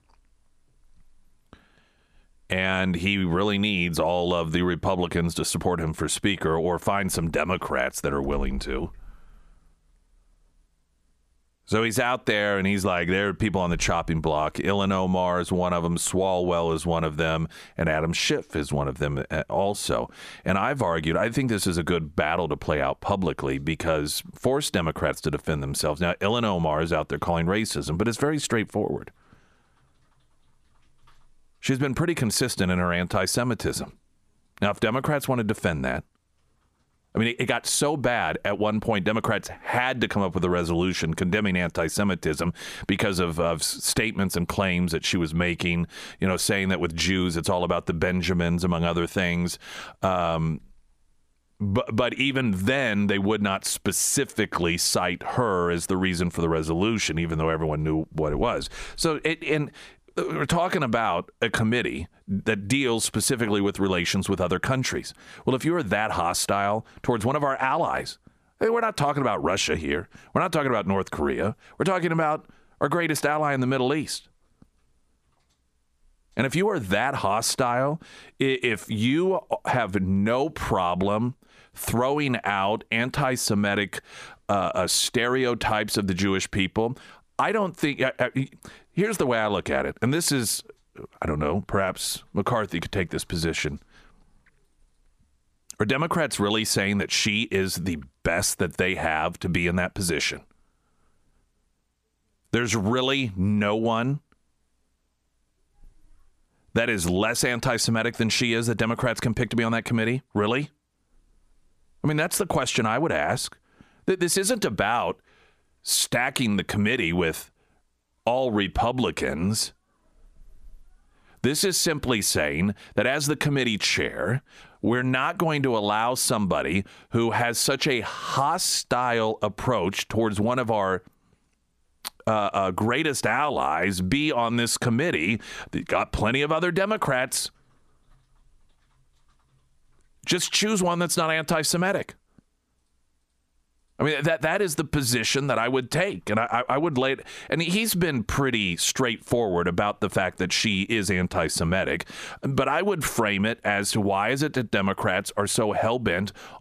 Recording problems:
squashed, flat; somewhat

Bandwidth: 14.5 kHz